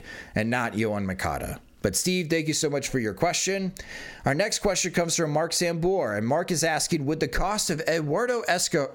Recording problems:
squashed, flat; somewhat

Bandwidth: 17.5 kHz